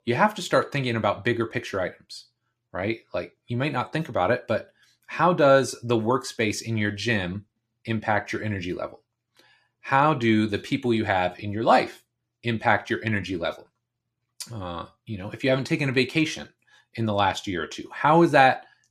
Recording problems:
none

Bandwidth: 14.5 kHz